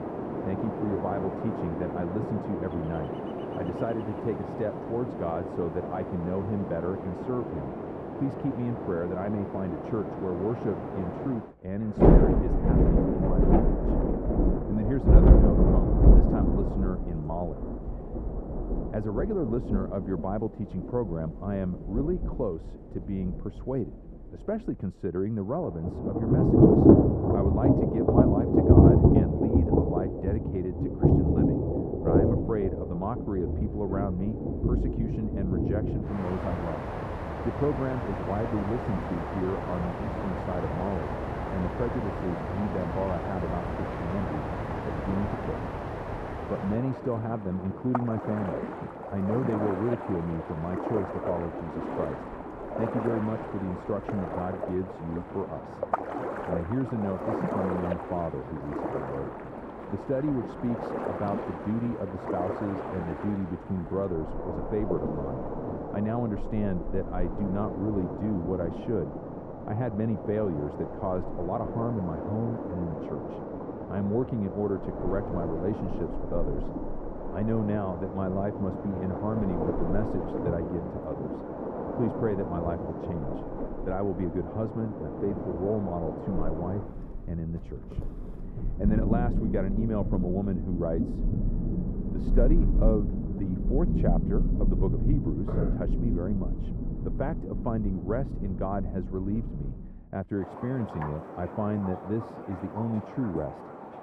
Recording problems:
muffled; very; fading above 1.5 kHz
rain or running water; very loud; throughout; 3 dB above the speech

